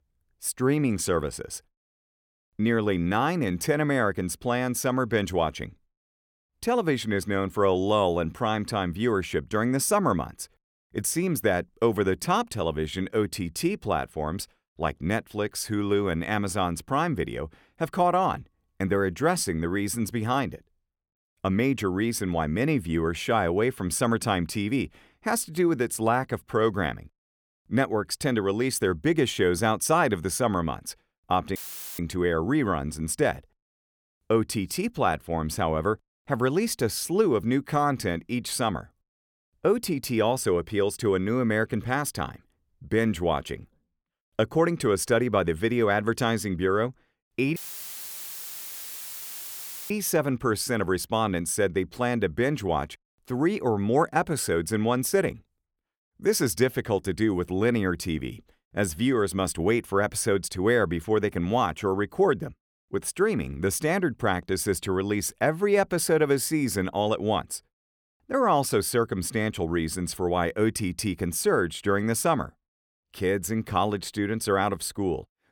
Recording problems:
audio cutting out; filled with static; at 32 s and at 48 s for 2.5 s

